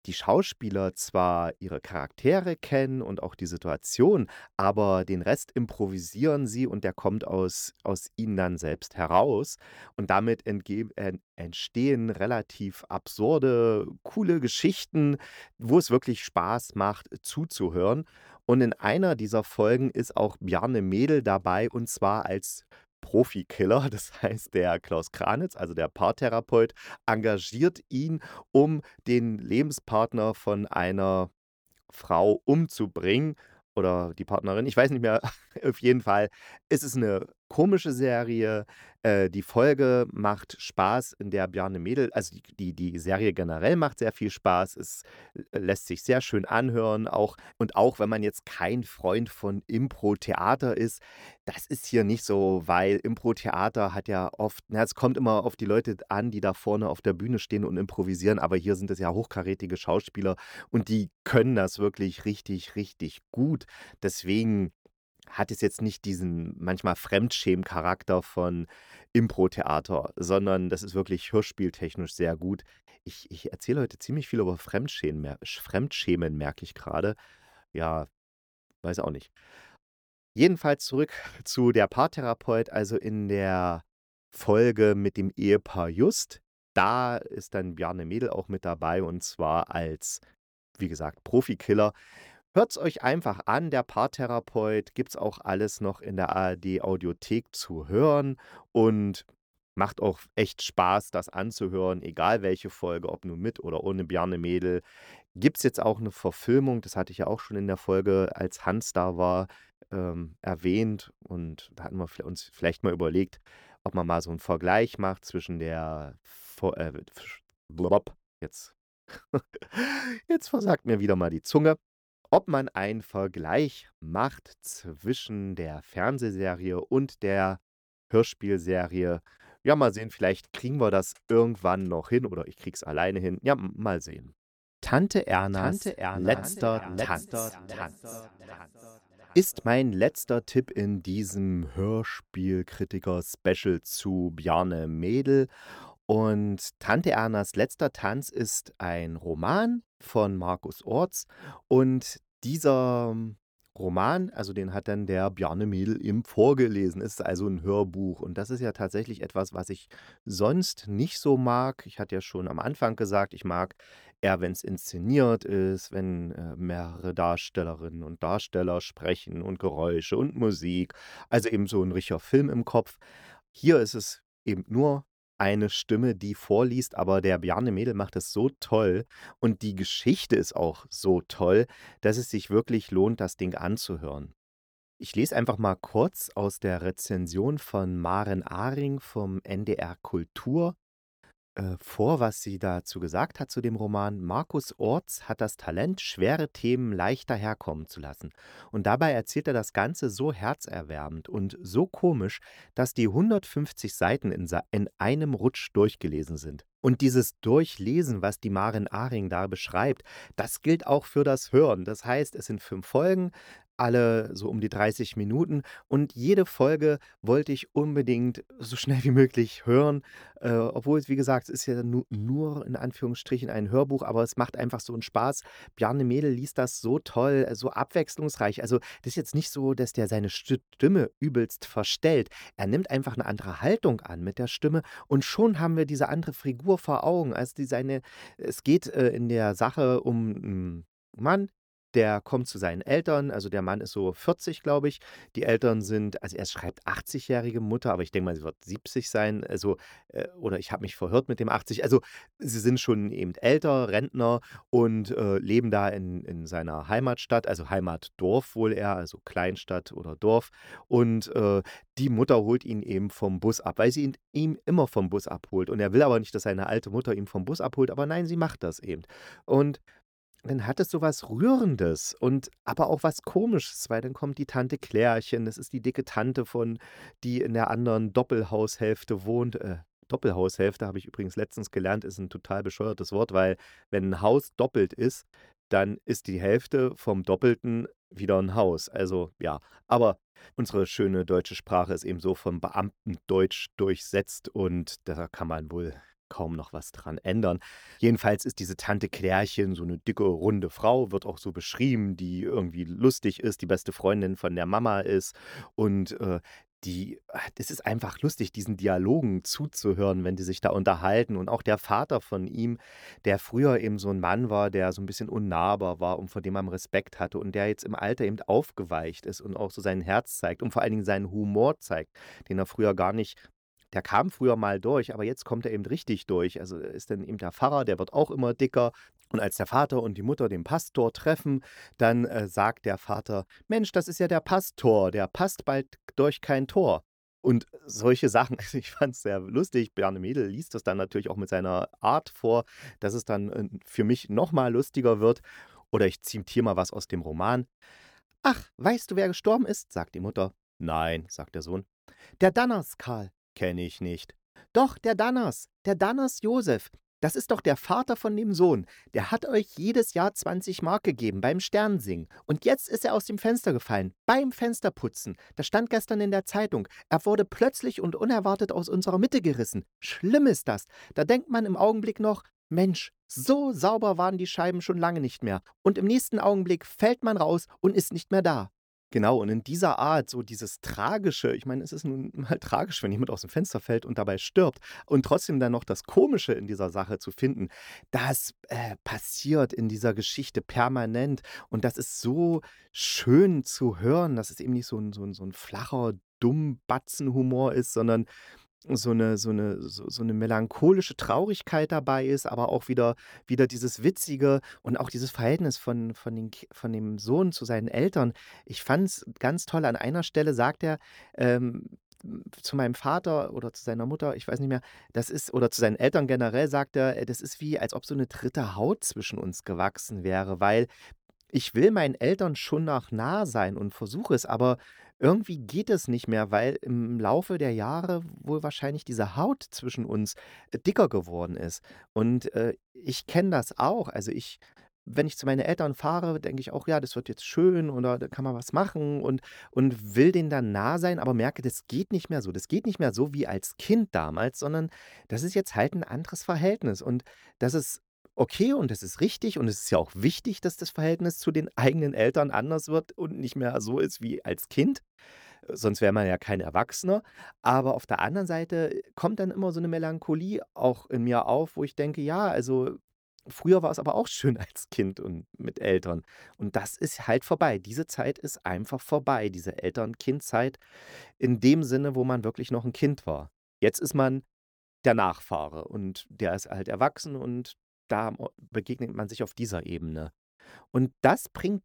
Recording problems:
none

